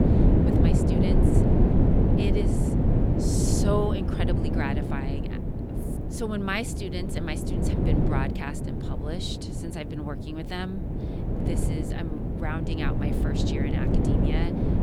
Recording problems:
wind noise on the microphone; heavy; 2 dB above the speech

